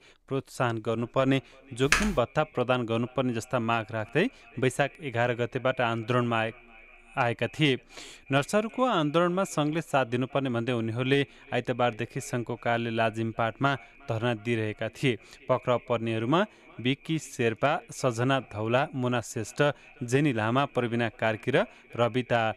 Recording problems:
echo of what is said; faint; throughout; 360 ms later, 25 dB below the speech
keyboard typing; loud; at 2 s; peak 2 dB above the speech

